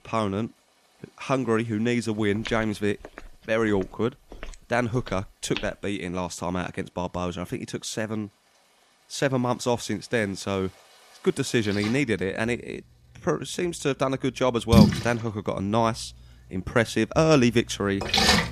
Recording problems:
rain or running water; very loud; throughout; 4 dB above the speech
footsteps; noticeable; from 2.5 to 5.5 s; peak 10 dB below the speech

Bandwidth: 14.5 kHz